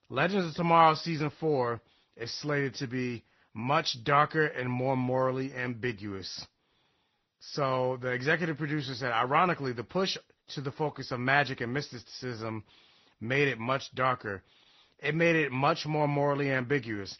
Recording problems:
high frequencies cut off; noticeable; nothing above 6 kHz
garbled, watery; slightly

